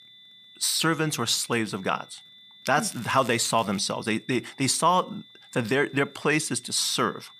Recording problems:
high-pitched whine; faint; throughout; 3.5 kHz, 25 dB below the speech
crackling; faint; at 3 s; 20 dB below the speech

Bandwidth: 15 kHz